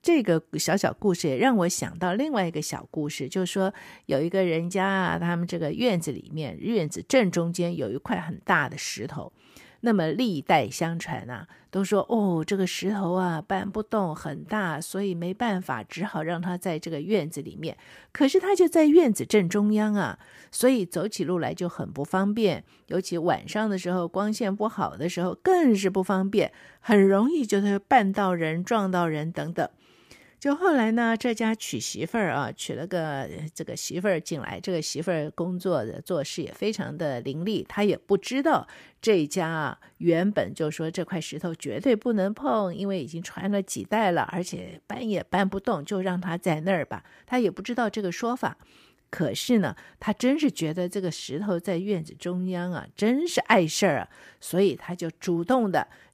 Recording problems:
none

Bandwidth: 15 kHz